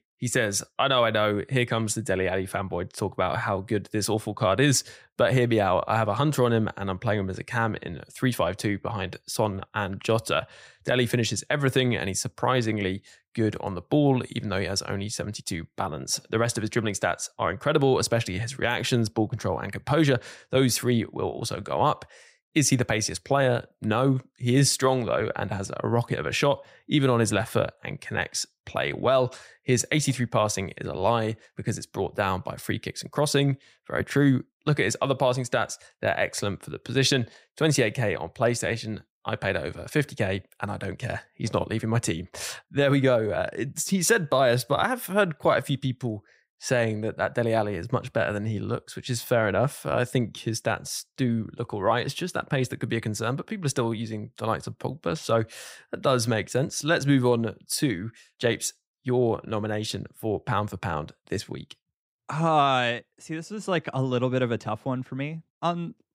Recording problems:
none

